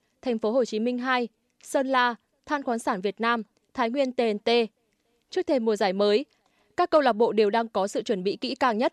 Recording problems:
none

